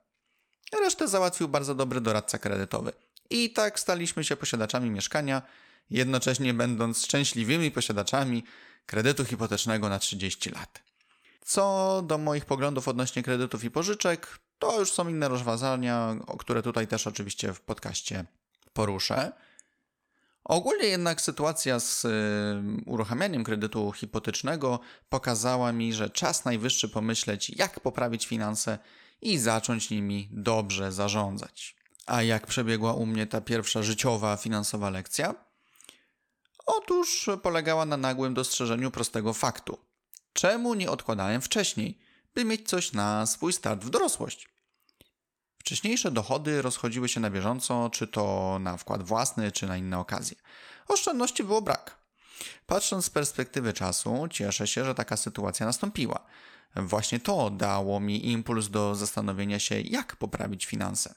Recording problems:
none

